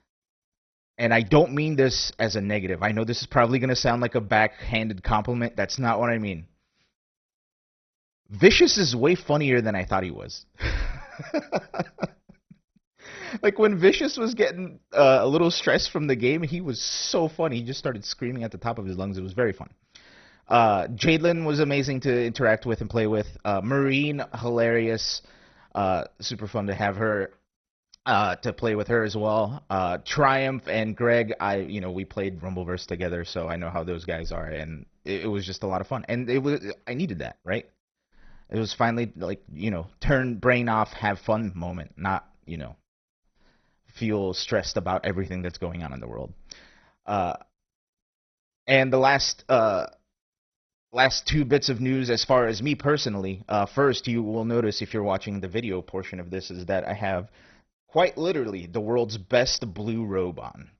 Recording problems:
garbled, watery; badly; nothing above 6 kHz

